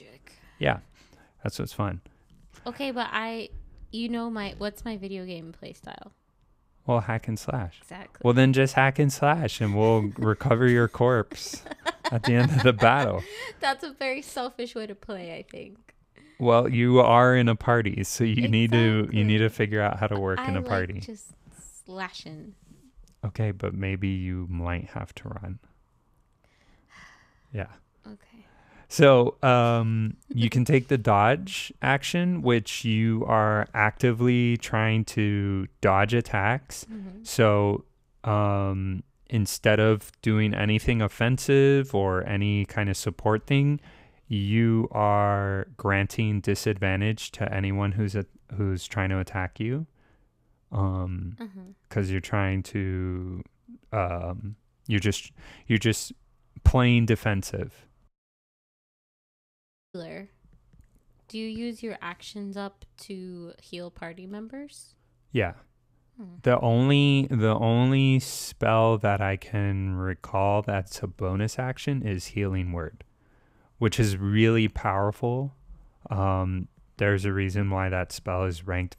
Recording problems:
audio cutting out; at 58 s for 2 s

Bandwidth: 15.5 kHz